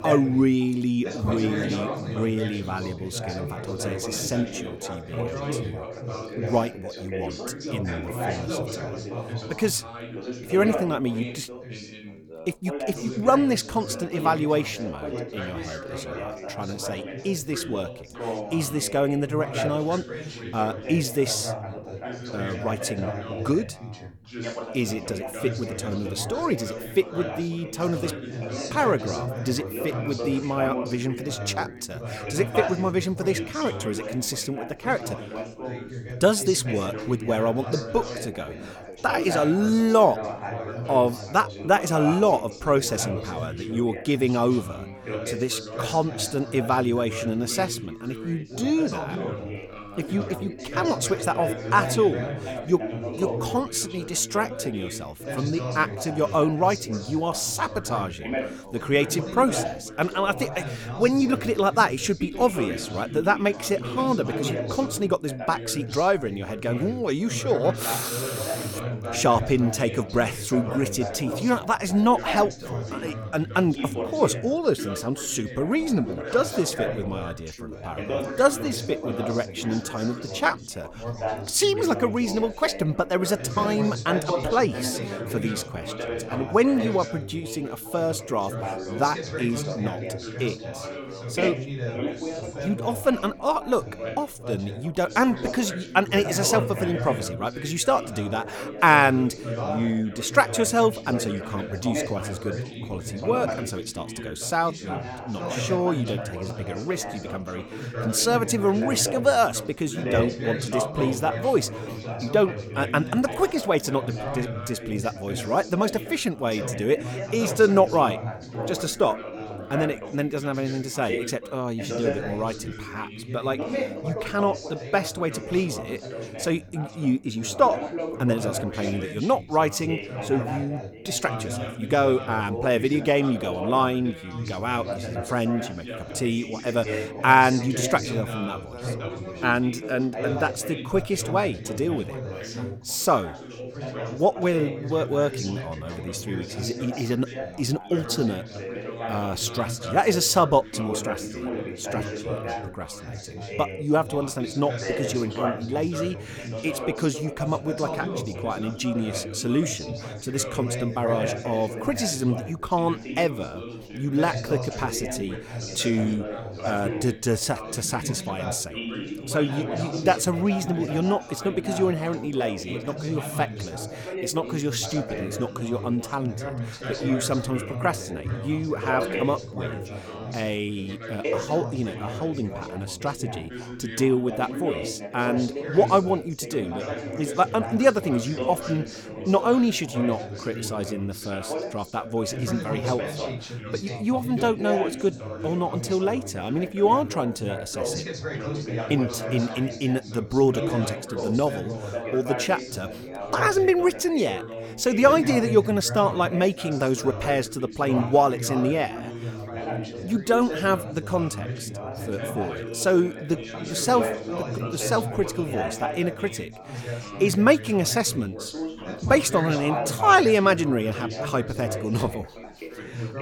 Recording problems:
background chatter; loud; throughout; 4 voices, 8 dB below the speech

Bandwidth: 18.5 kHz